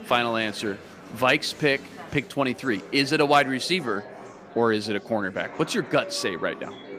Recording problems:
chatter from many people; noticeable; throughout; 15 dB below the speech

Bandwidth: 15 kHz